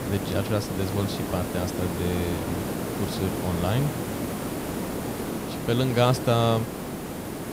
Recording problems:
hiss; loud; throughout; 4 dB below the speech

